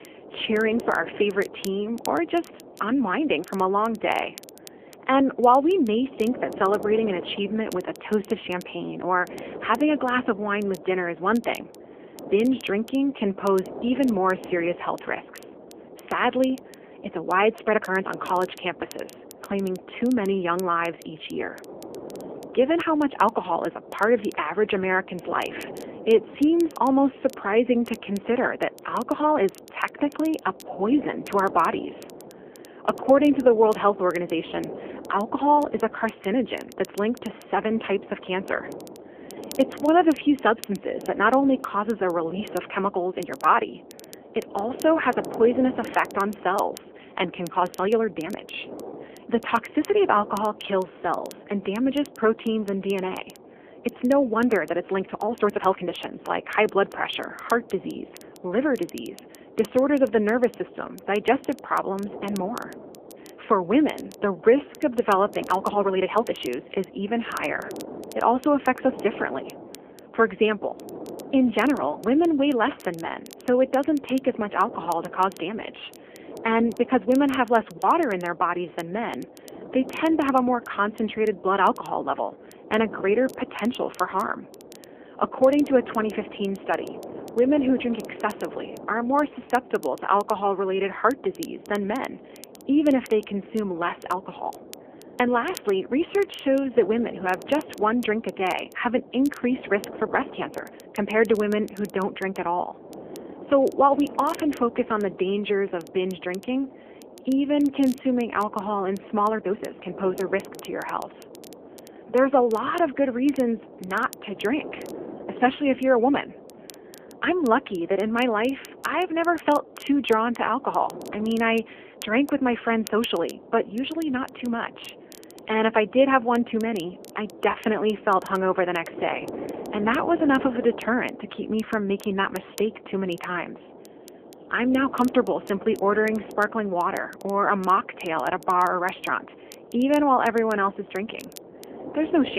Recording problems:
phone-call audio; nothing above 3 kHz
wind noise on the microphone; occasional gusts; 20 dB below the speech
crackle, like an old record; faint; 25 dB below the speech
uneven, jittery; strongly; from 18 s to 2:21
abrupt cut into speech; at the end

